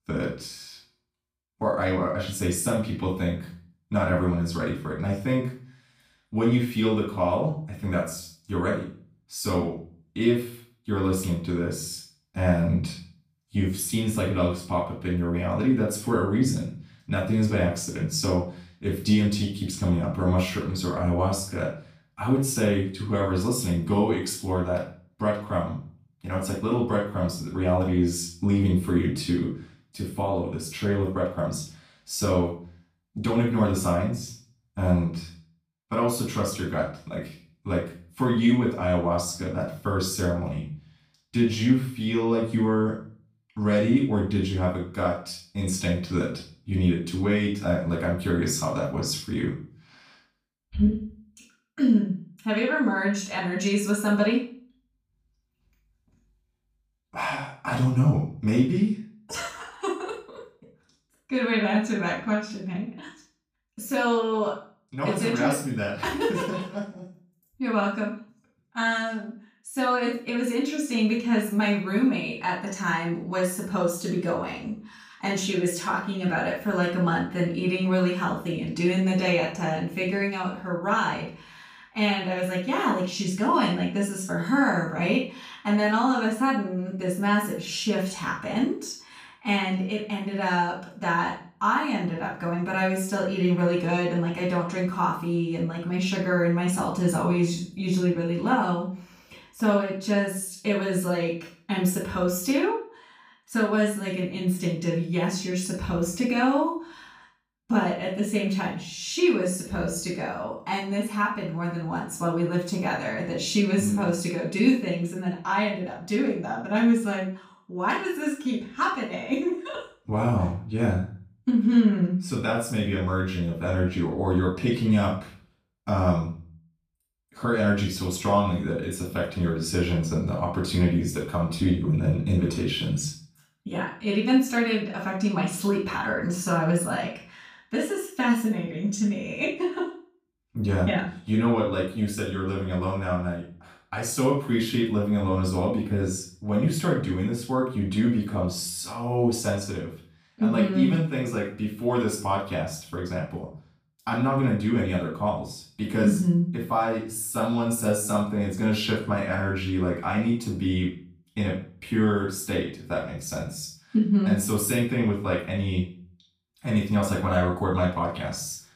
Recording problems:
off-mic speech; far
room echo; noticeable; dies away in 0.4 s

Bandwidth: 15 kHz